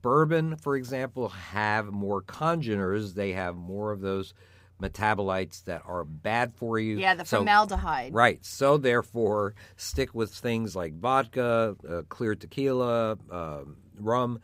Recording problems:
none

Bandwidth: 15.5 kHz